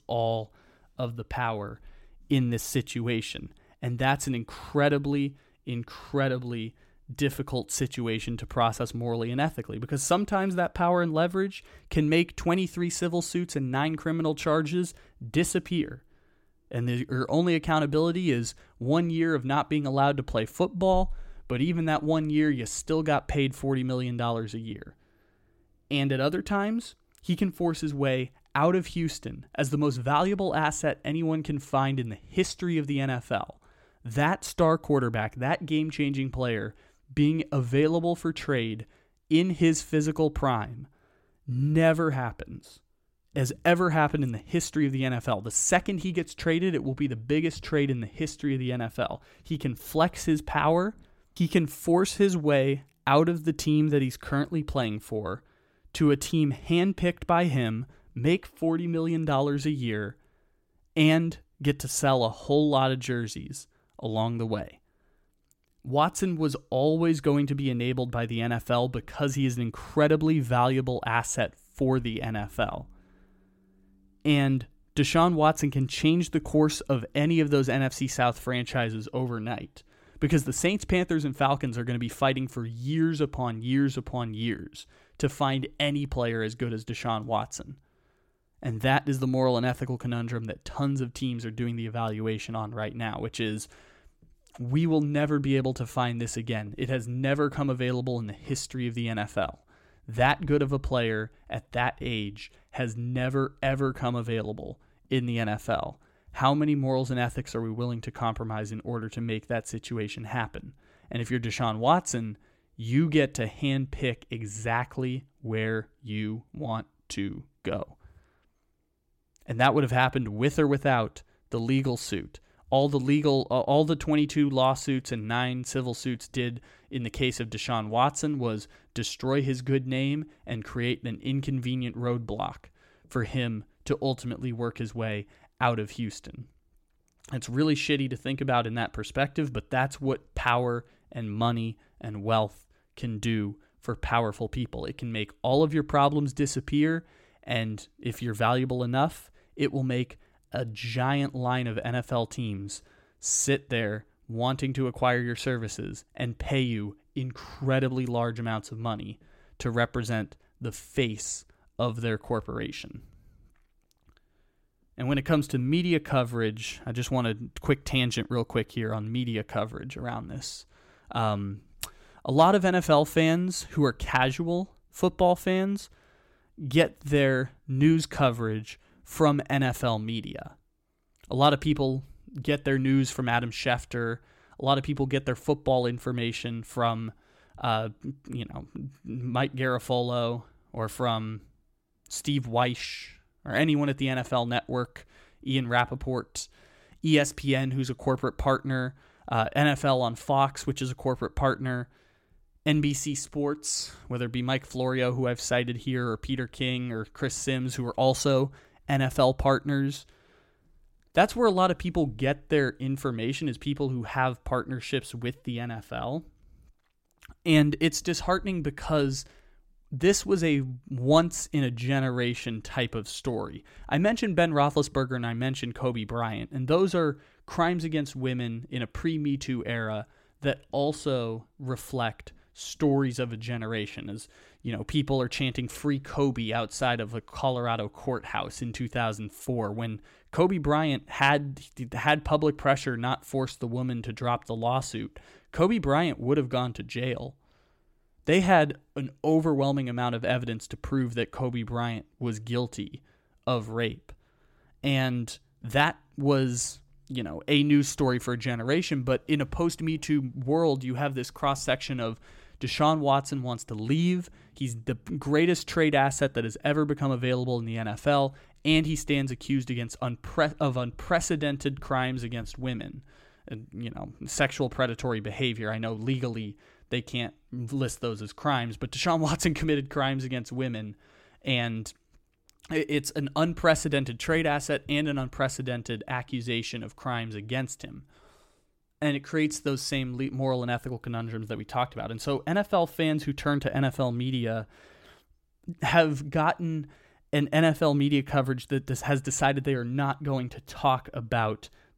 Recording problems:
none

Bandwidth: 16.5 kHz